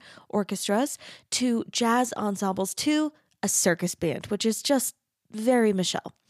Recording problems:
none

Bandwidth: 15 kHz